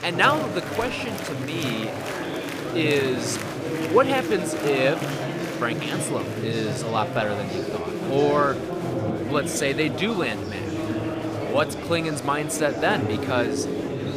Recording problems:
murmuring crowd; loud; throughout; 3 dB below the speech

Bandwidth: 15 kHz